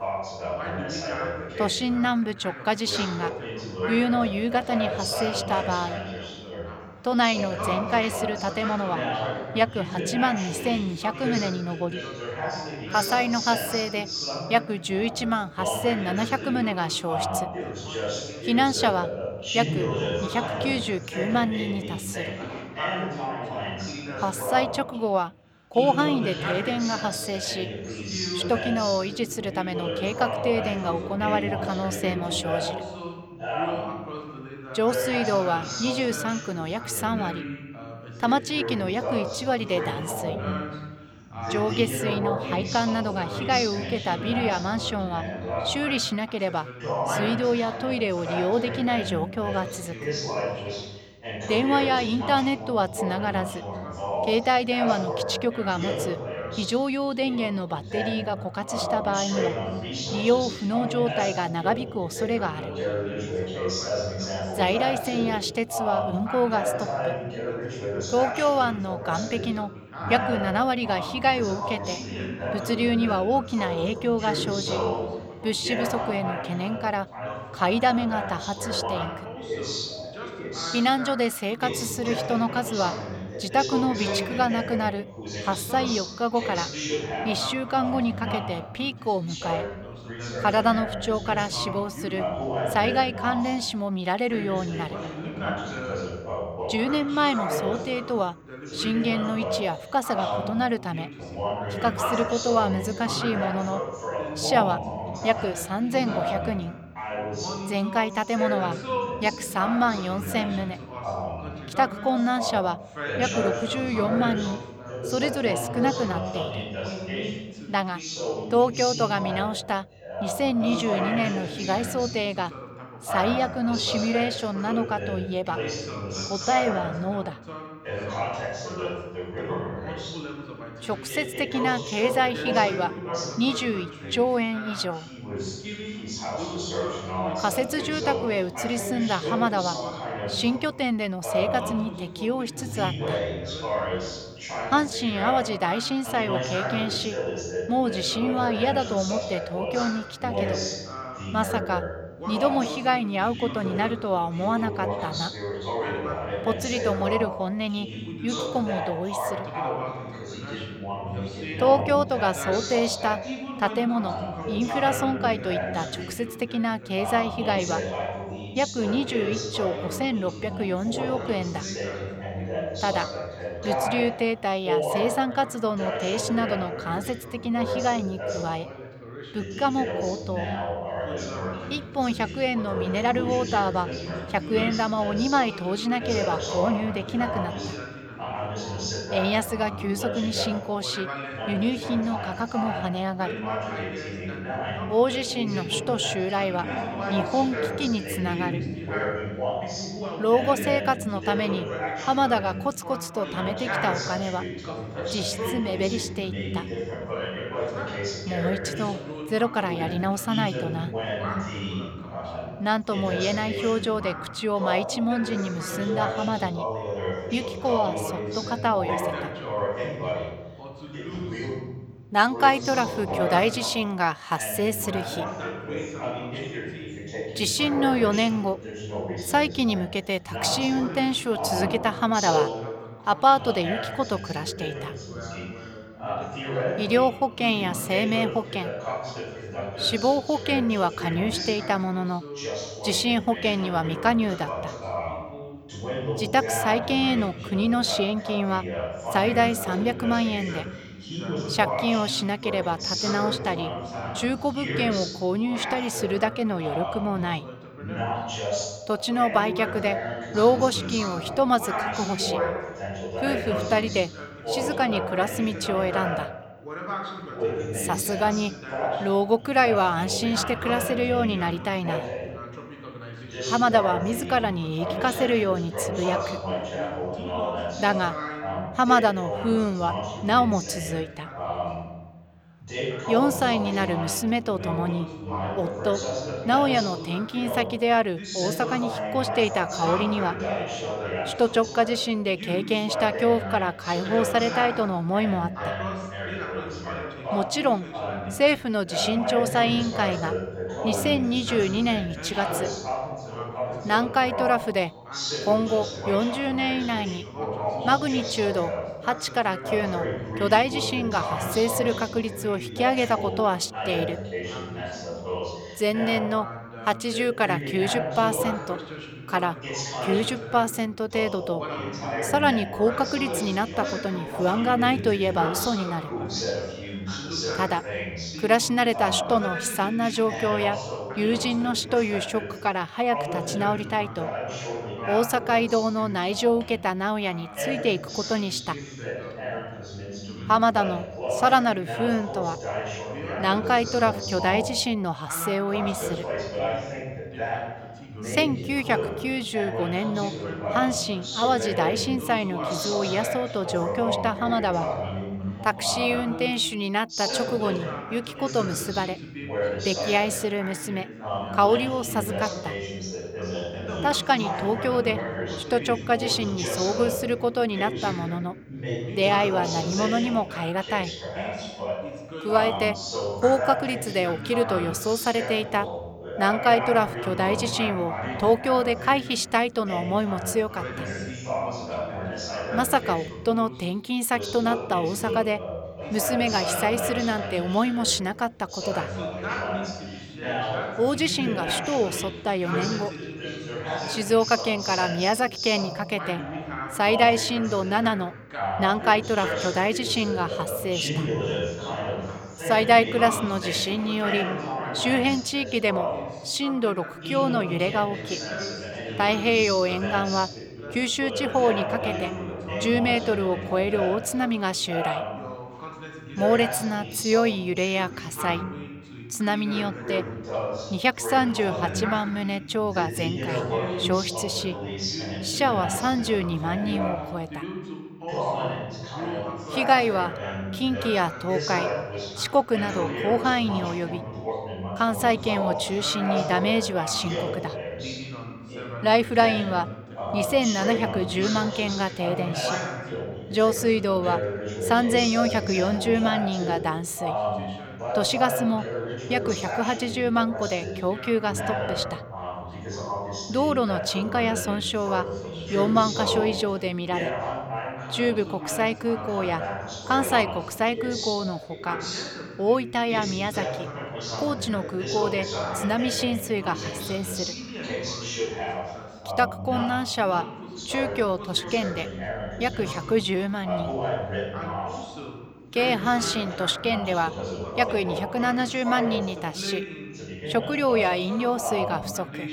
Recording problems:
background chatter; loud; throughout; 2 voices, 6 dB below the speech

